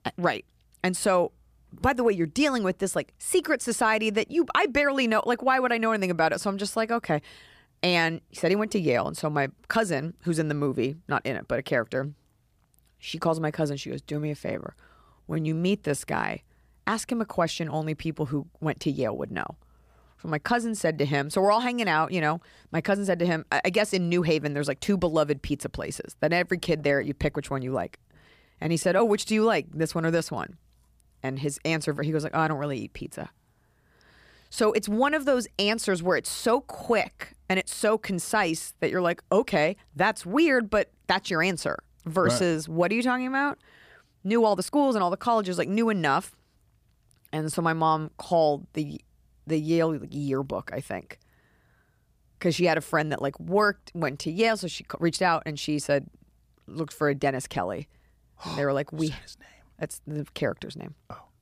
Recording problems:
uneven, jittery; strongly; from 15 to 57 s

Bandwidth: 15 kHz